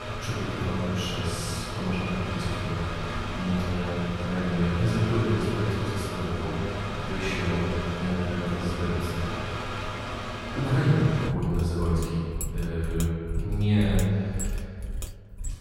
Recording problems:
room echo; strong; dies away in 2.2 s
off-mic speech; far
machinery noise; loud; throughout; 5 dB below the speech

